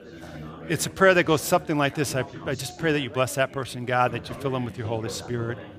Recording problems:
chatter from many people; noticeable; throughout; 15 dB below the speech

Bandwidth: 15 kHz